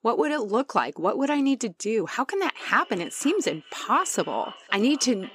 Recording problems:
echo of what is said; faint; from 2.5 s on; 510 ms later, 20 dB below the speech

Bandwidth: 15.5 kHz